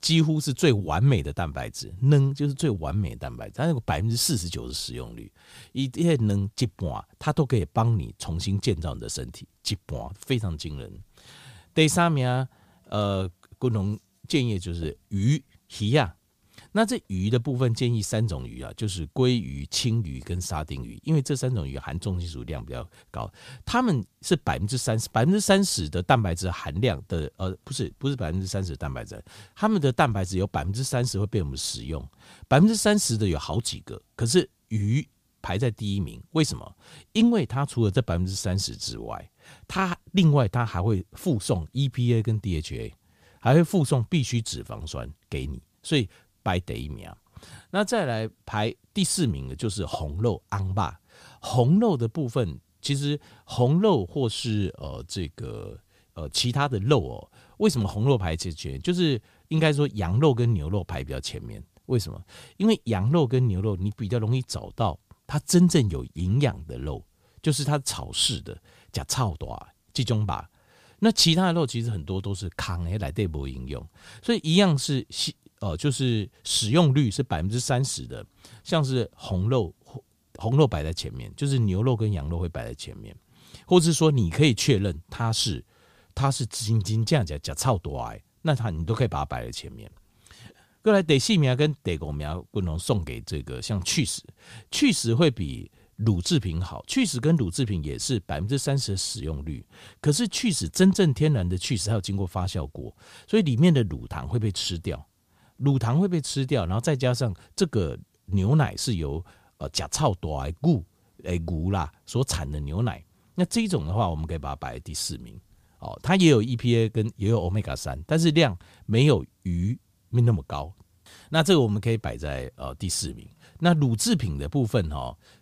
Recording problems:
none

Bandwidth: 15 kHz